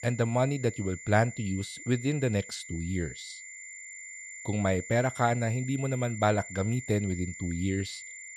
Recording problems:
high-pitched whine; noticeable; throughout; 2 kHz, 10 dB below the speech

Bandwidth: 13.5 kHz